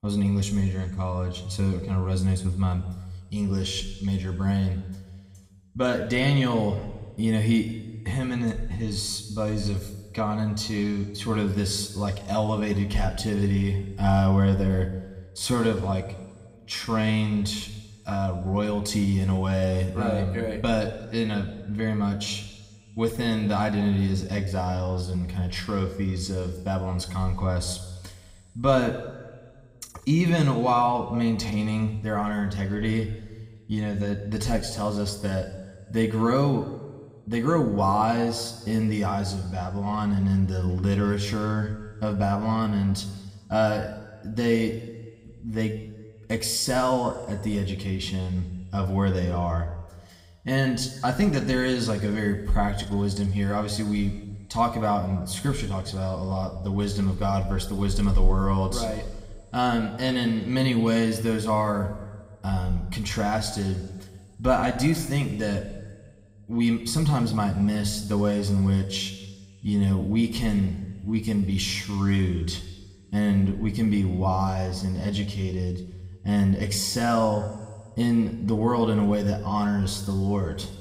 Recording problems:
room echo; slight; dies away in 1.4 s
off-mic speech; somewhat distant

